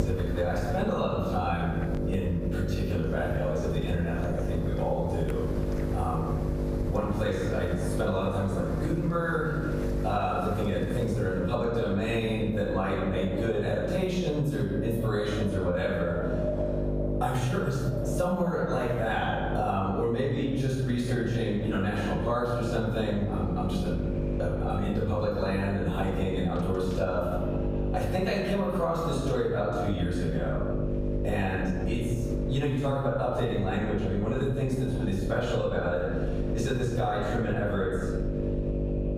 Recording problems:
off-mic speech; far
room echo; noticeable; dies away in 0.9 s
squashed, flat; somewhat
electrical hum; loud; throughout; 50 Hz, 8 dB below the speech
wind in the background; noticeable; throughout; 10 dB below the speech

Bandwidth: 15 kHz